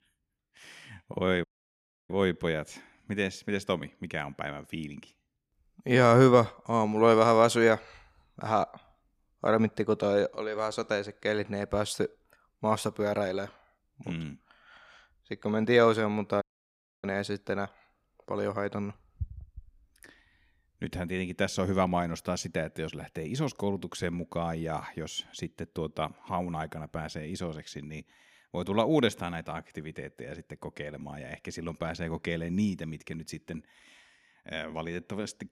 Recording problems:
audio cutting out; at 1.5 s for 0.5 s and at 16 s for 0.5 s

